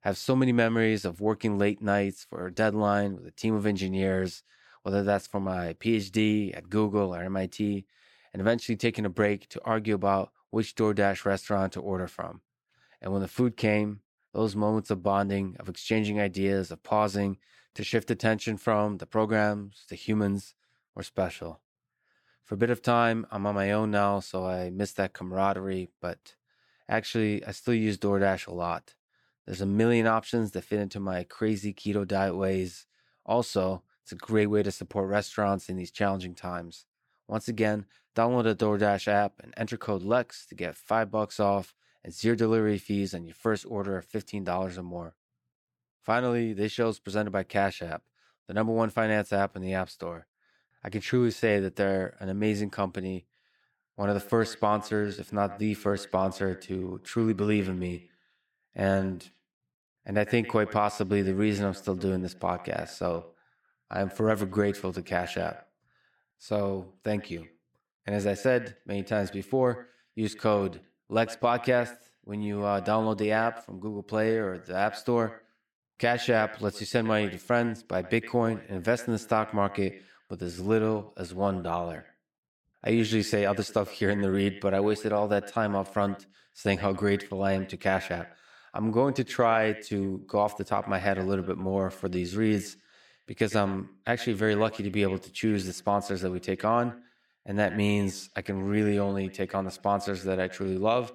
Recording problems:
echo of what is said; noticeable; from 54 s on; 100 ms later, 20 dB below the speech

